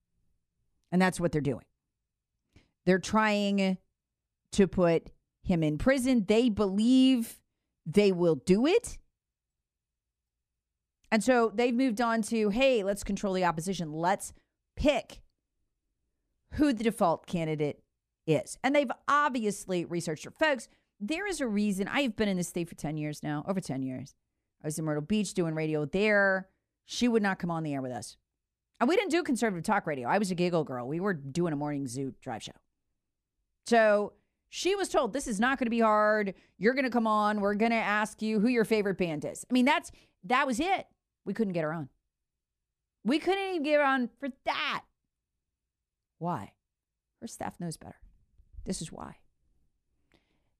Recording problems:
none

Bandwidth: 15 kHz